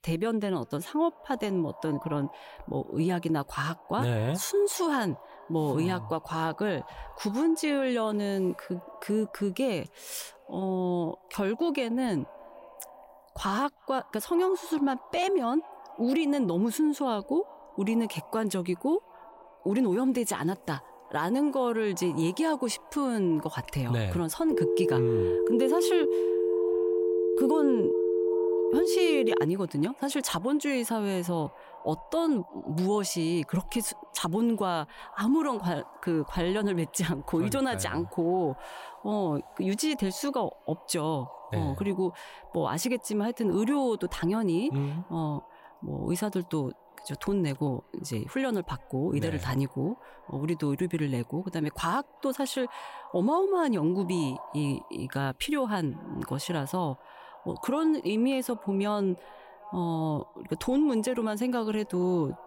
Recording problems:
echo of what is said; faint; throughout; 370 ms later, 20 dB below the speech
phone ringing; loud; from 25 to 29 s; peak 3 dB above the speech

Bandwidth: 16 kHz